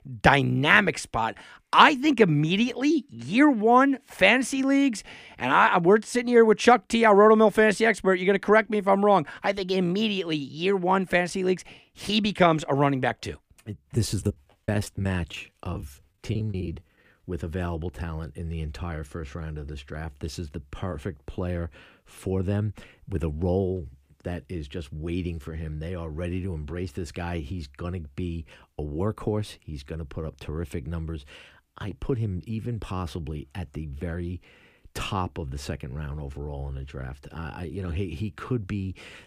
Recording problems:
choppy; very; from 14 to 17 s; 16% of the speech affected

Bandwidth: 15 kHz